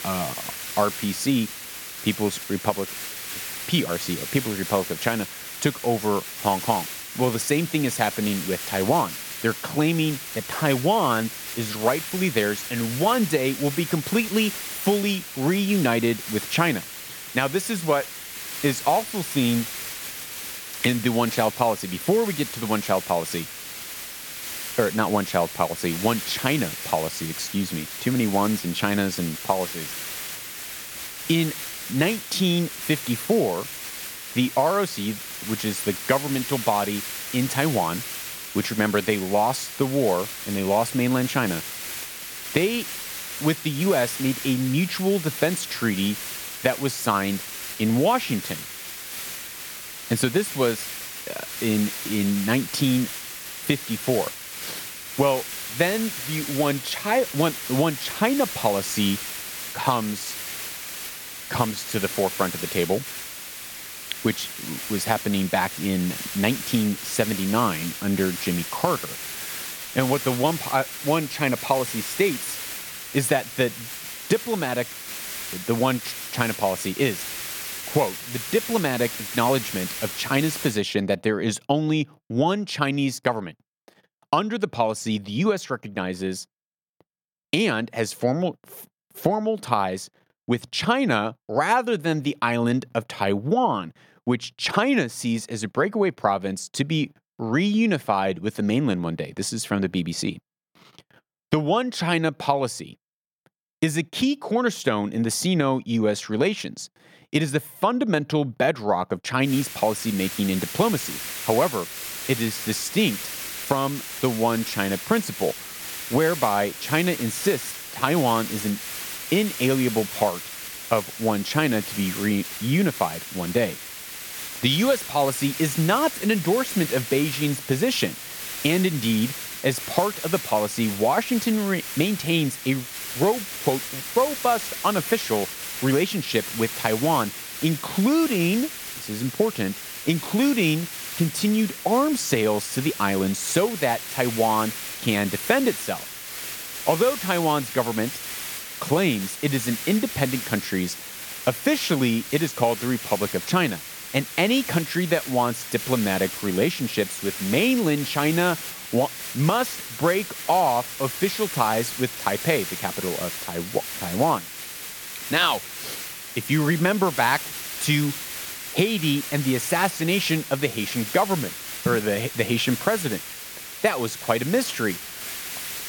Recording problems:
hiss; loud; until 1:21 and from 1:49 on; 7 dB below the speech

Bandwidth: 18 kHz